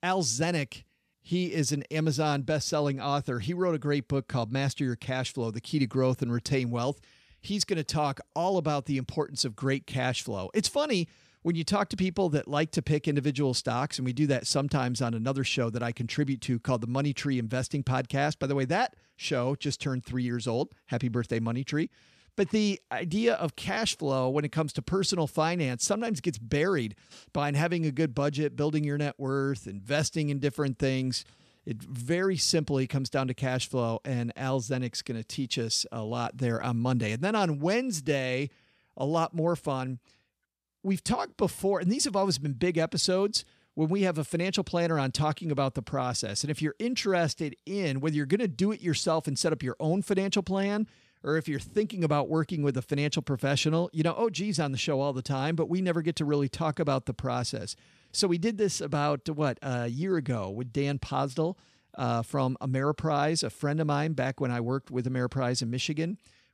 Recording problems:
none

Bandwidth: 14.5 kHz